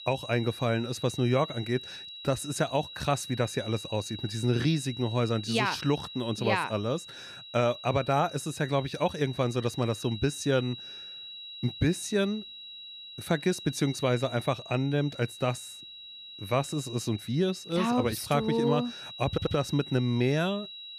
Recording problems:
high-pitched whine; noticeable; throughout; 4 kHz, 10 dB below the speech
audio stuttering; at 19 s

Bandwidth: 14.5 kHz